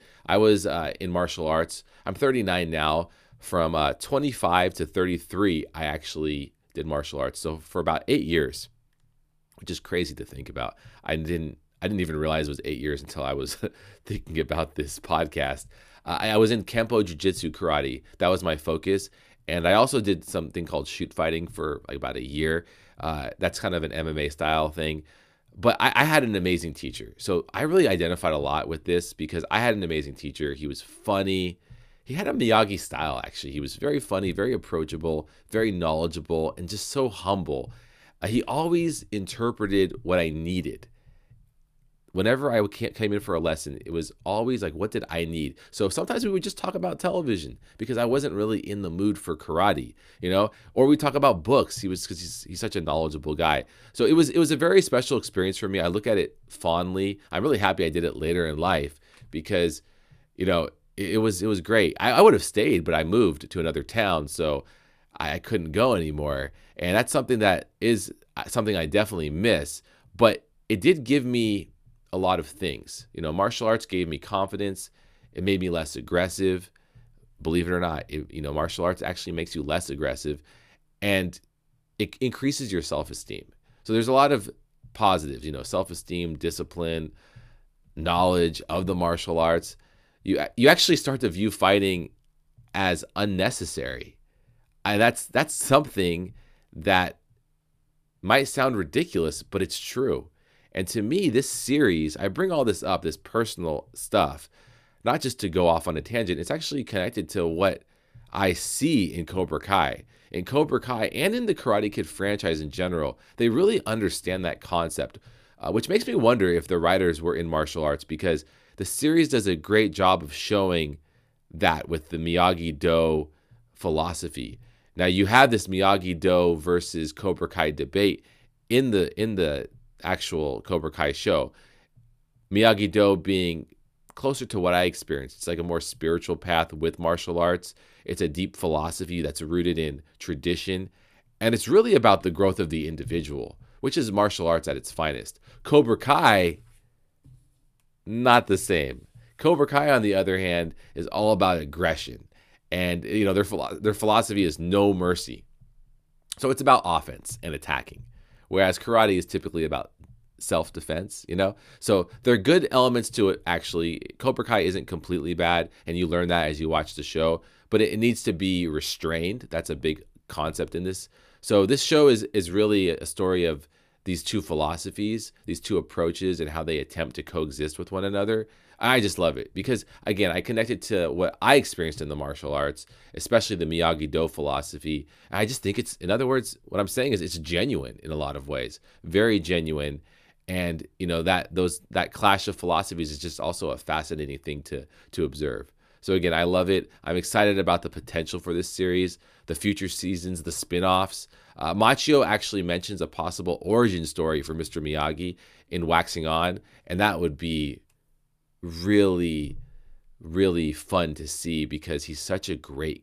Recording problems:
none

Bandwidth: 14.5 kHz